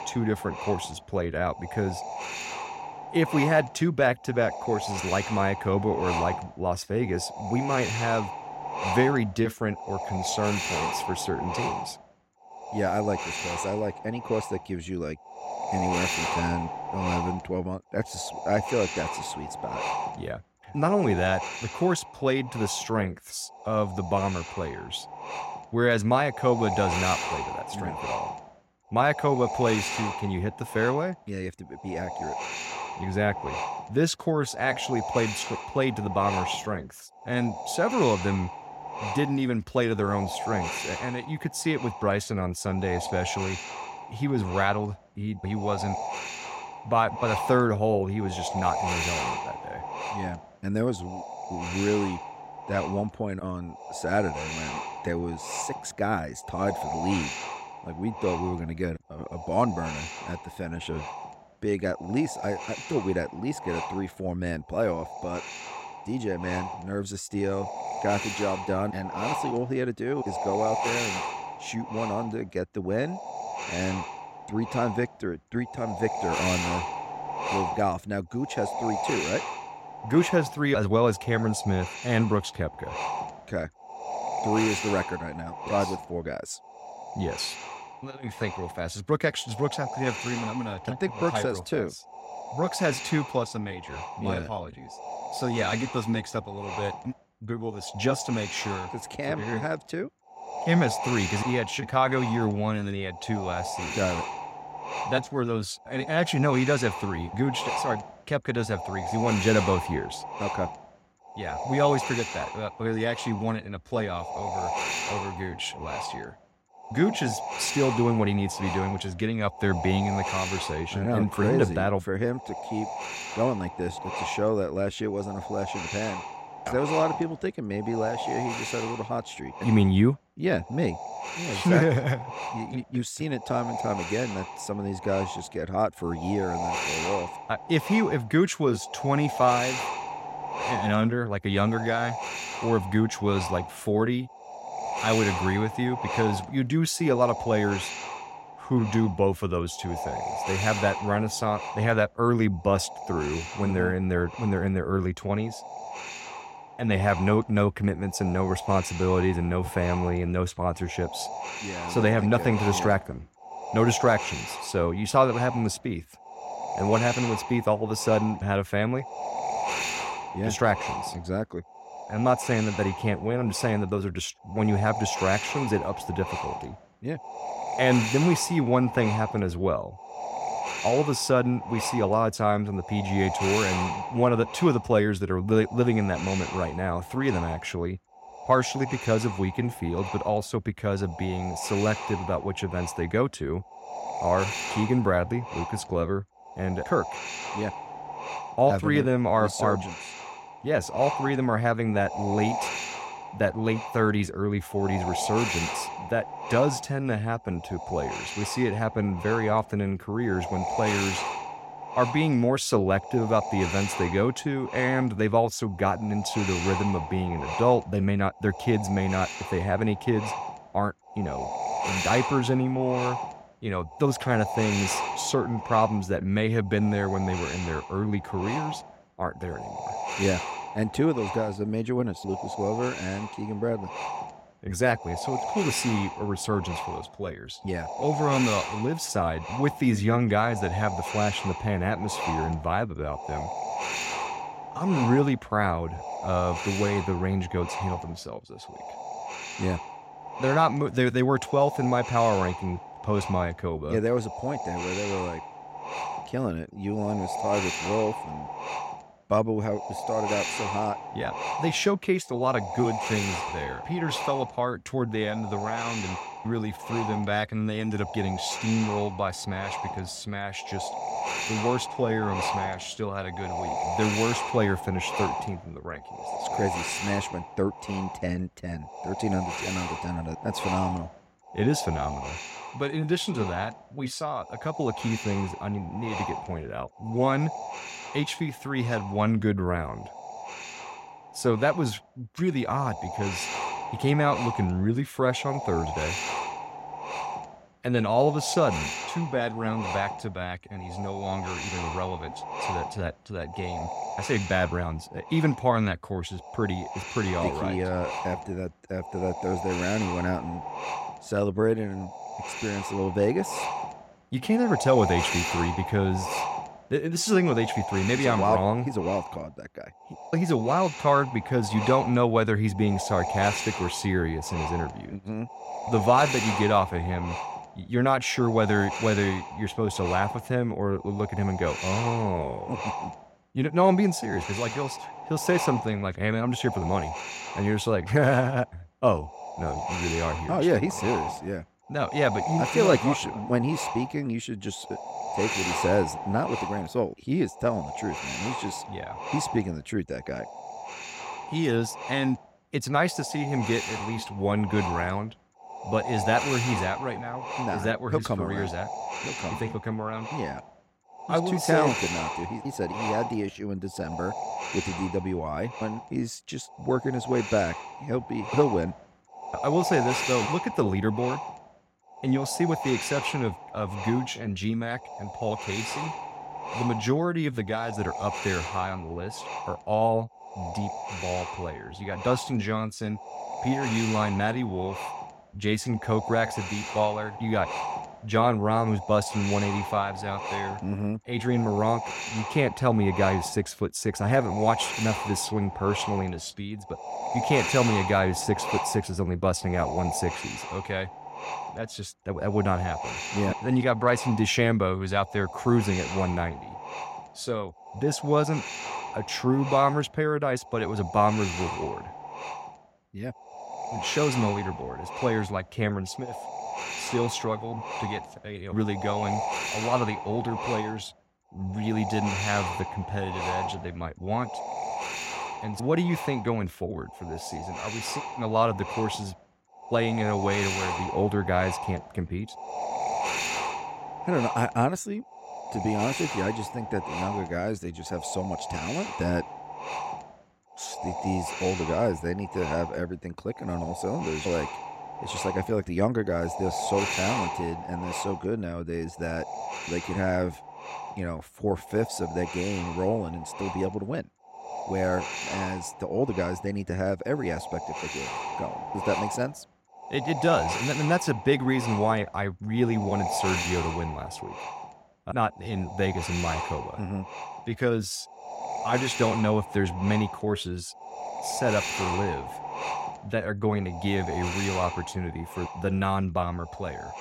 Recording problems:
wind noise on the microphone; heavy; 4 dB below the speech

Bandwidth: 16 kHz